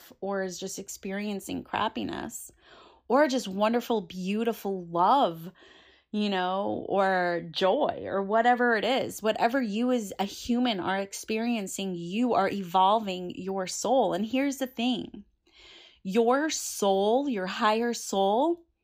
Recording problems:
none

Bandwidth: 15 kHz